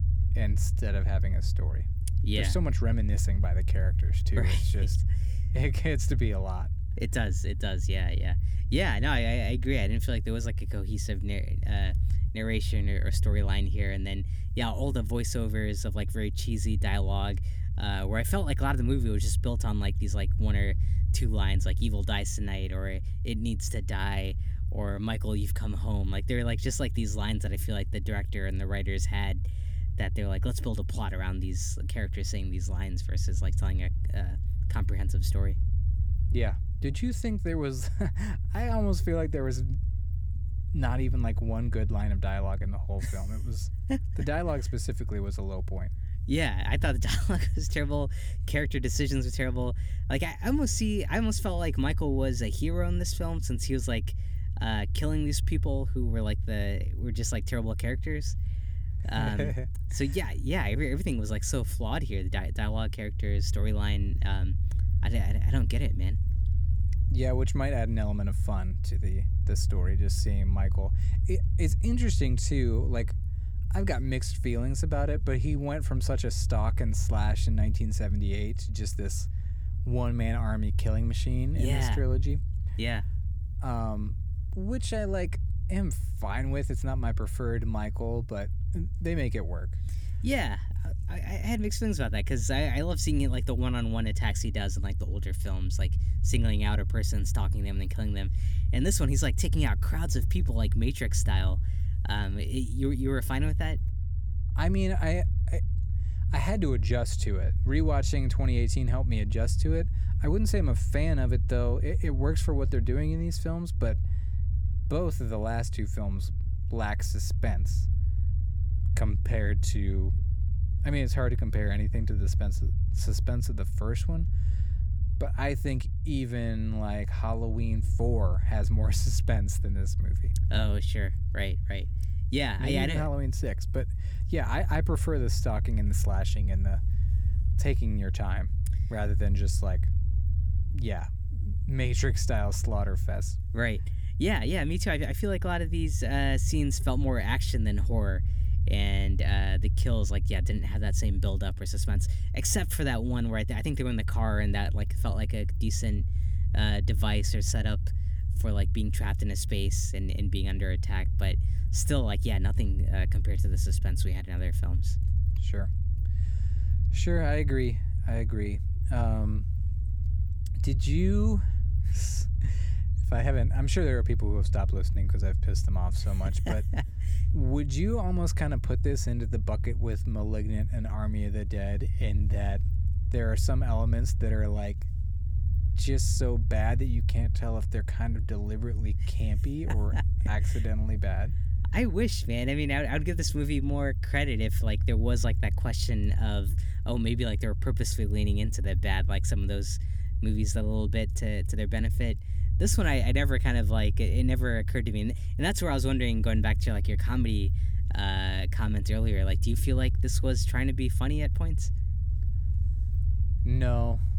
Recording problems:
low rumble; noticeable; throughout; 10 dB below the speech

